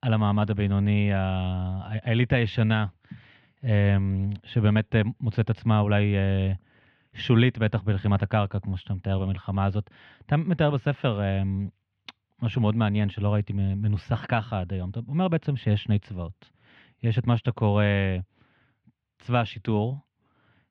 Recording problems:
muffled; very; fading above 3 kHz

